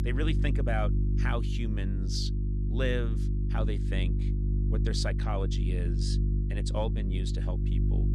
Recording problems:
electrical hum; loud; throughout; 50 Hz, 6 dB below the speech

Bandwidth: 14 kHz